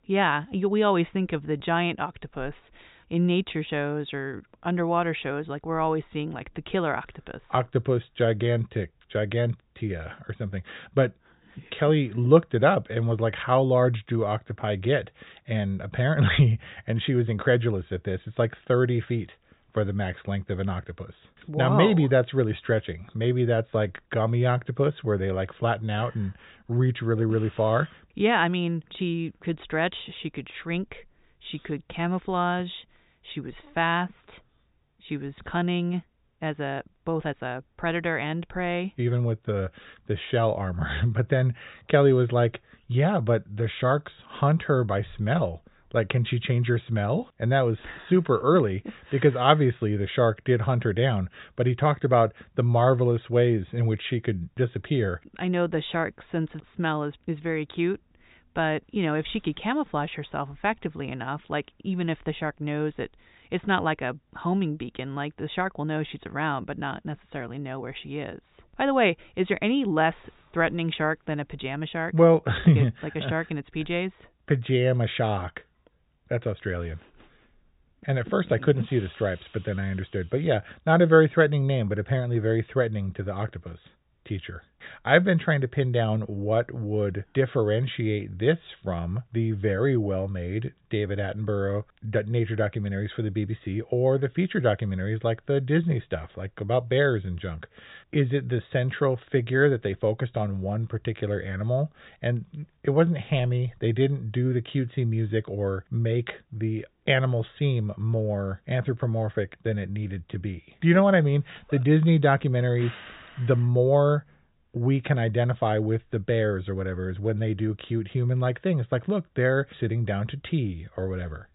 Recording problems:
high frequencies cut off; severe; nothing above 4 kHz

